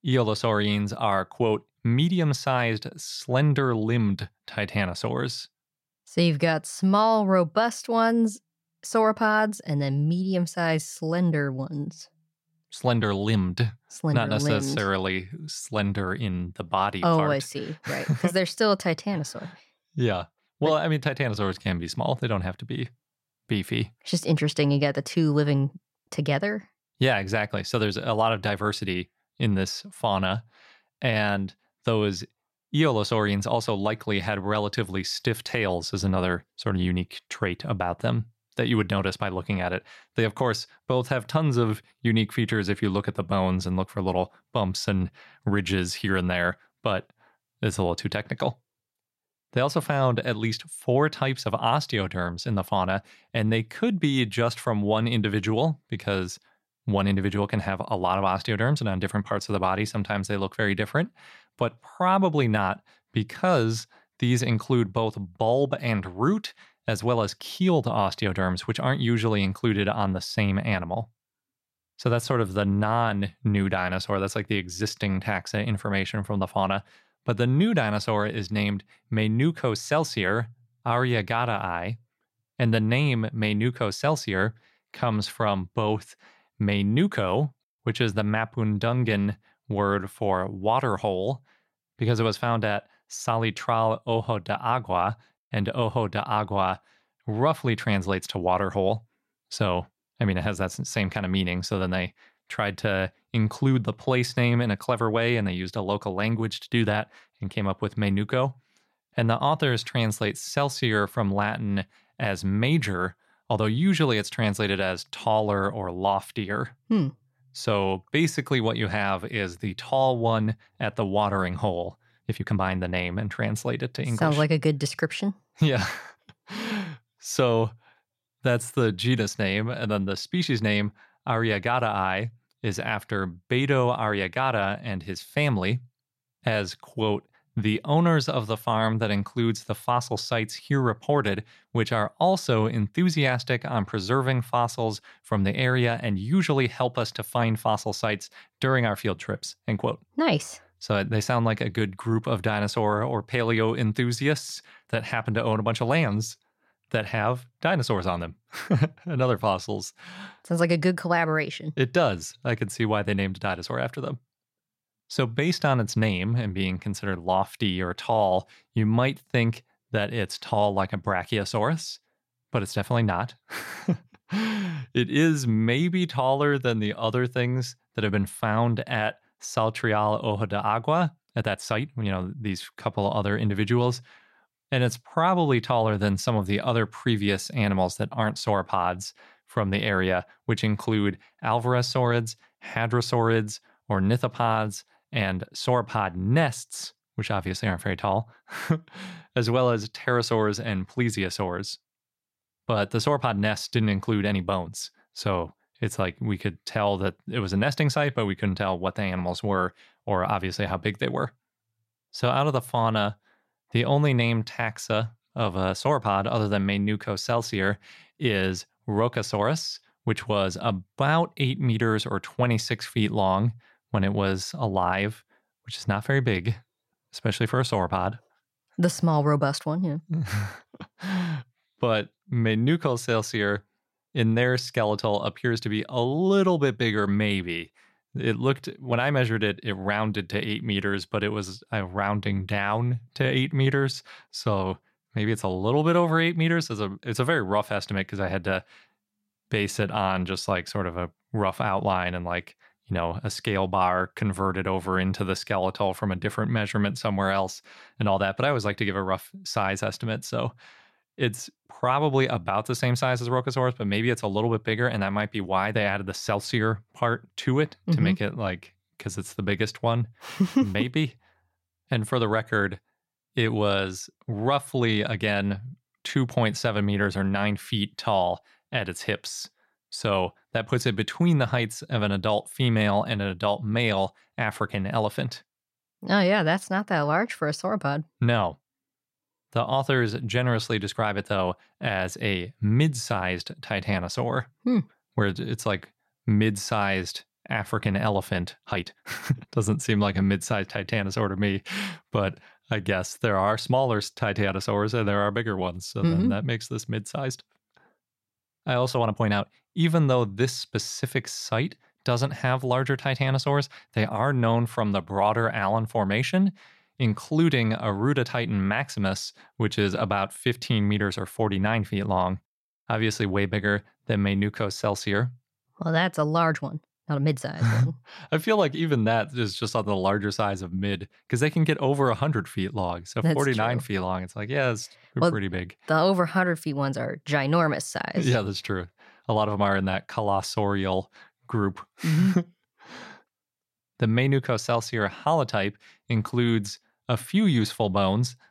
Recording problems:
uneven, jittery; strongly; from 21 s to 5:27

